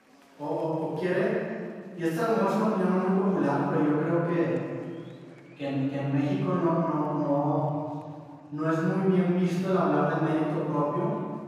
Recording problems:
room echo; strong; dies away in 1.8 s
off-mic speech; far
murmuring crowd; faint; throughout; 30 dB below the speech

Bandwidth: 15 kHz